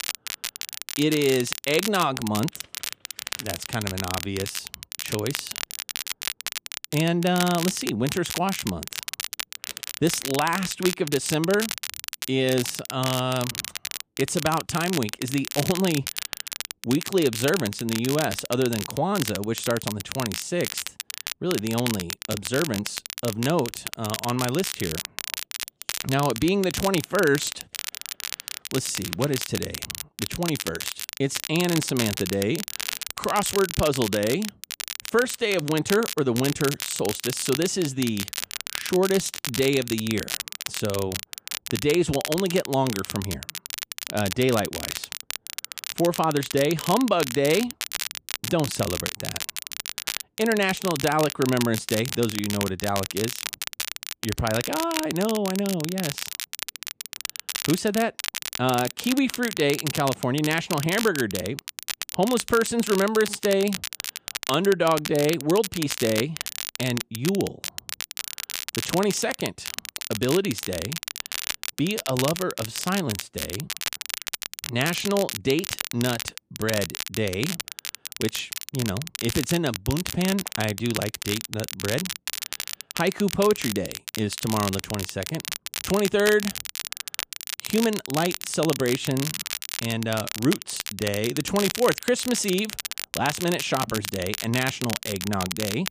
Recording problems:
crackle, like an old record; loud; 6 dB below the speech

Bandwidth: 15 kHz